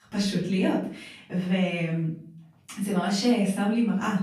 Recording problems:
off-mic speech; far
room echo; noticeable; dies away in 0.4 s

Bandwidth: 15 kHz